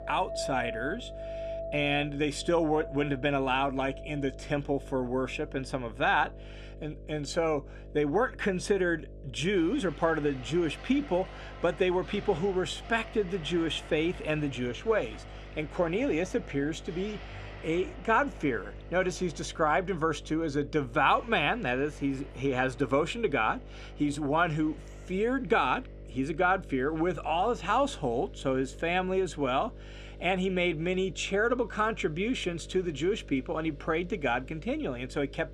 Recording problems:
household noises; noticeable; throughout; 15 dB below the speech
electrical hum; faint; throughout; 50 Hz, 25 dB below the speech

